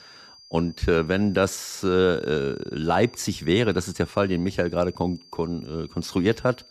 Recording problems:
high-pitched whine; faint; throughout; 5 kHz, 25 dB below the speech

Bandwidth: 14.5 kHz